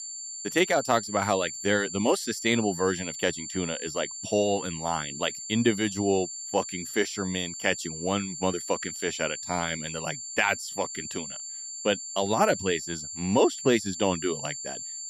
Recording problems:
high-pitched whine; loud; throughout; 7.5 kHz, 7 dB below the speech

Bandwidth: 14.5 kHz